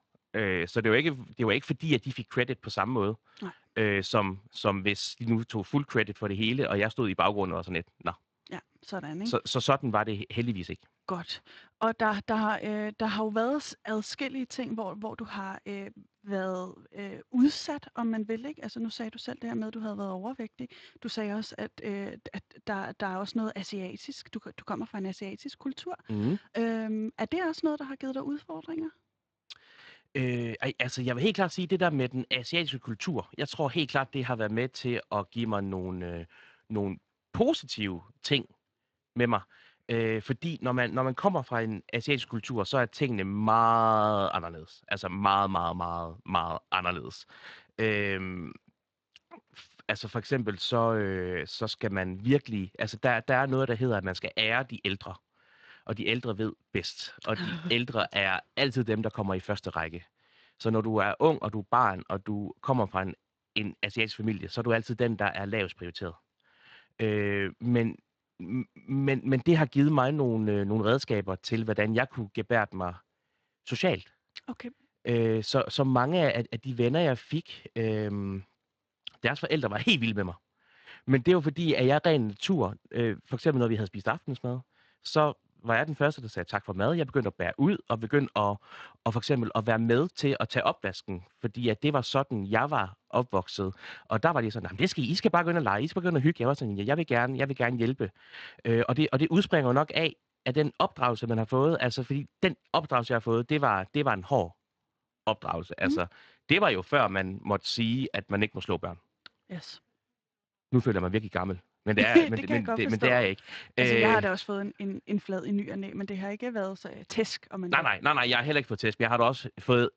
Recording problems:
garbled, watery; slightly; nothing above 7.5 kHz

